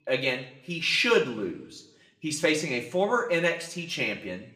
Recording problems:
room echo; very slight; dies away in 0.6 s
off-mic speech; somewhat distant

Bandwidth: 15 kHz